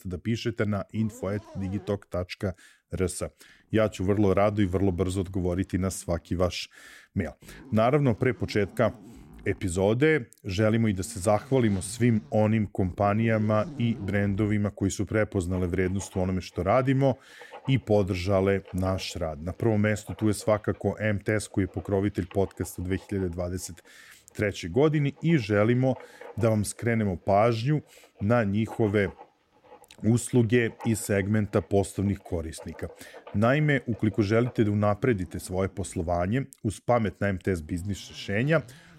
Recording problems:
household noises; faint; throughout; 25 dB below the speech

